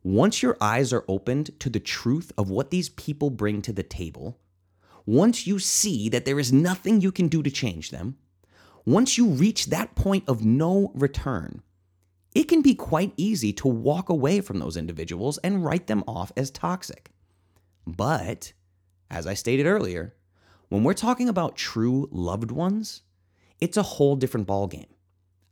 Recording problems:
none

